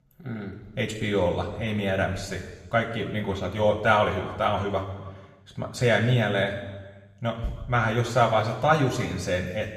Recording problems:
room echo; noticeable; dies away in 1.2 s
off-mic speech; somewhat distant

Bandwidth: 14.5 kHz